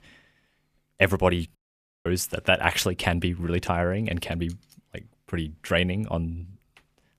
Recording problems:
audio cutting out; at 1.5 s for 0.5 s

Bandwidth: 14.5 kHz